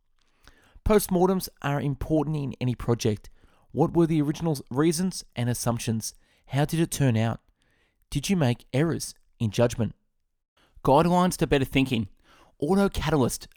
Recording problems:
none

